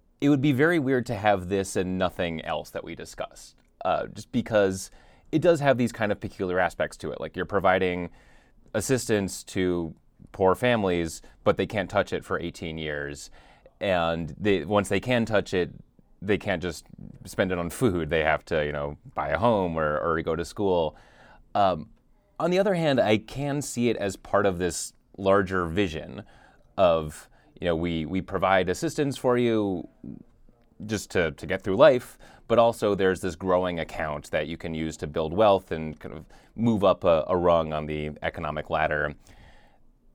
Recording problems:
none

